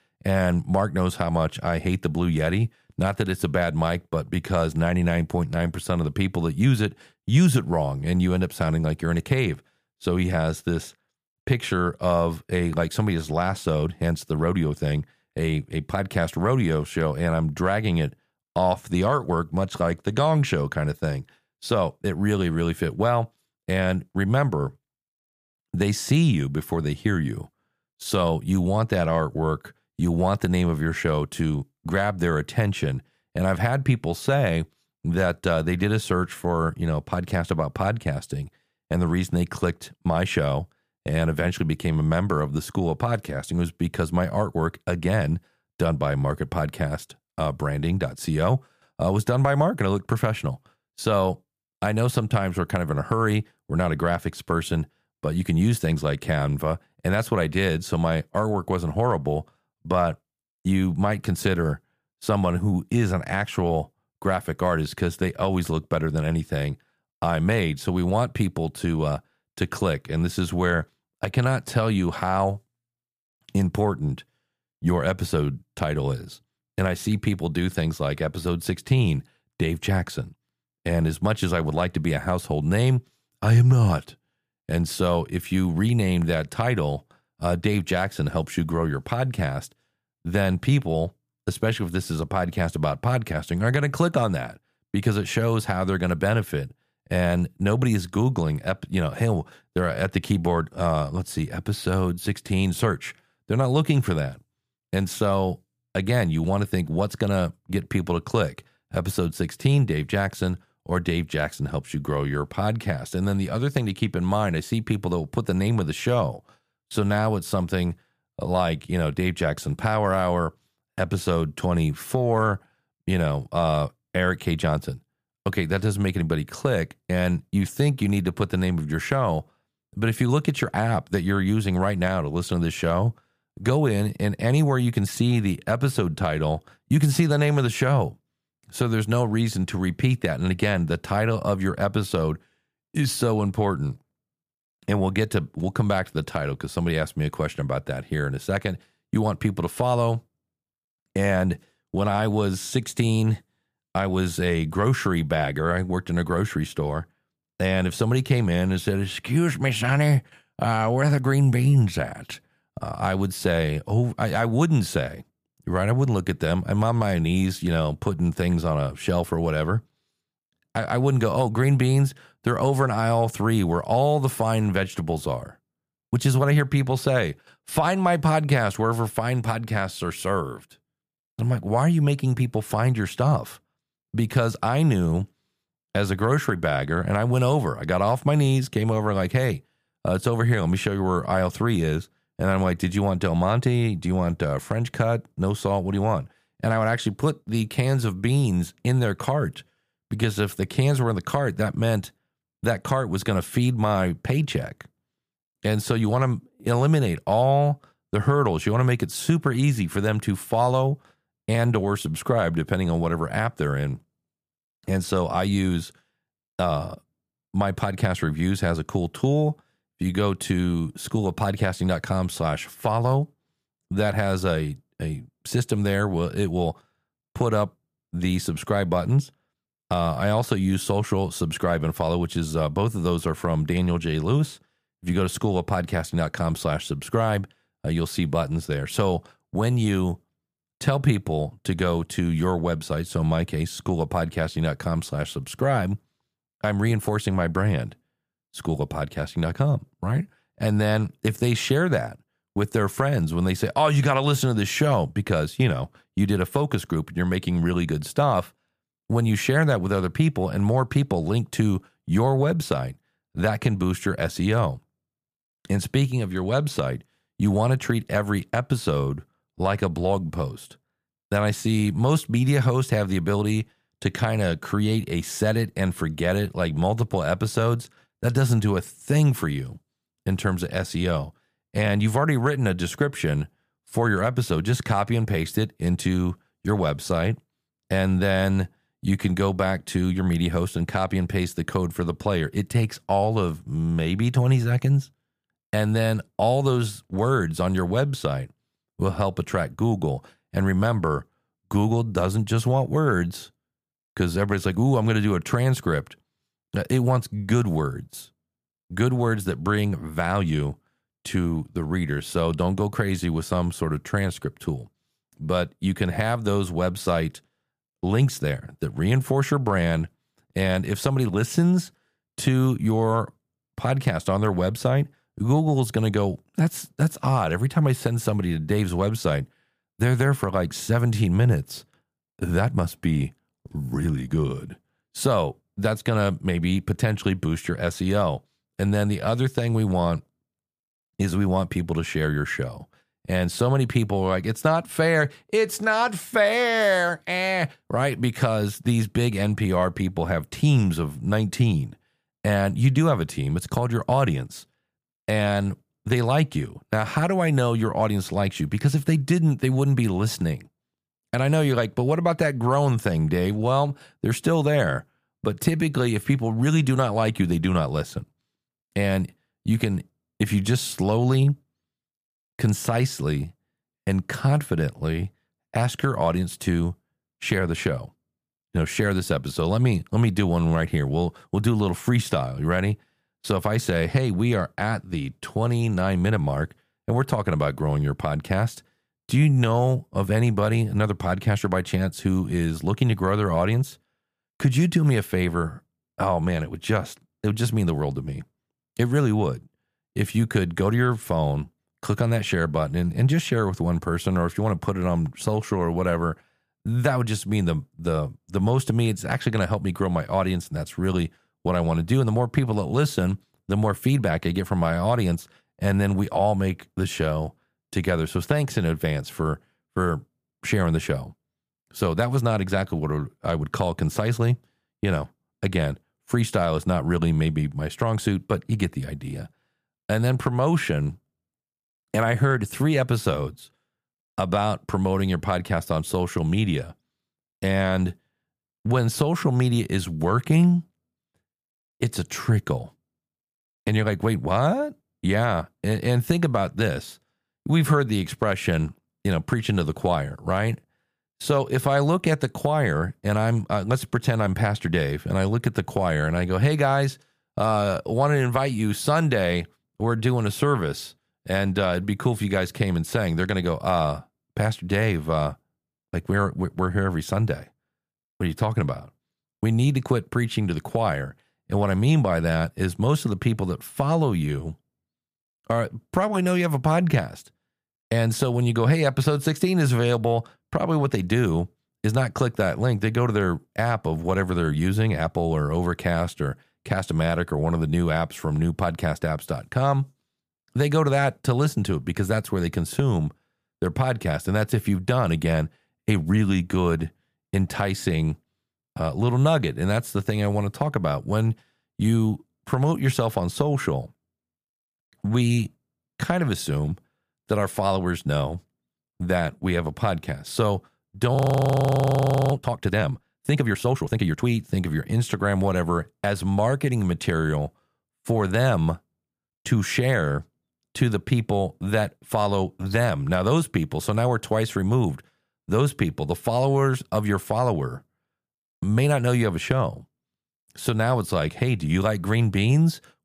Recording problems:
audio freezing; at 8:31 for 1 s

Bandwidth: 15 kHz